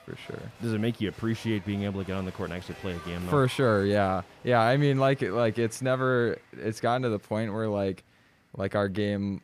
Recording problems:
crowd noise; faint; throughout; 20 dB below the speech

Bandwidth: 15 kHz